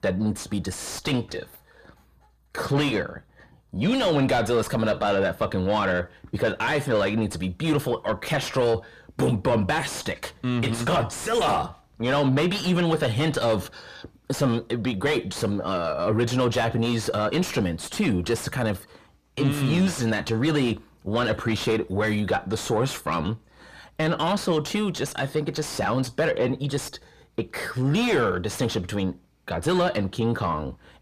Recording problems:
distortion; heavy; 7 dB below the speech

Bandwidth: 14.5 kHz